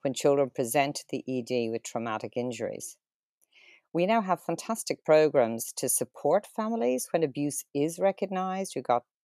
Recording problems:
none

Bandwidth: 14 kHz